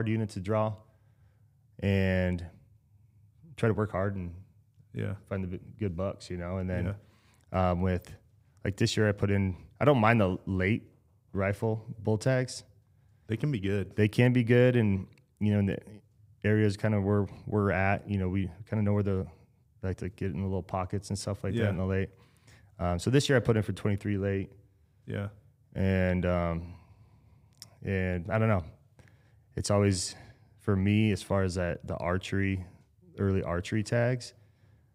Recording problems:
abrupt cut into speech; at the start

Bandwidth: 15.5 kHz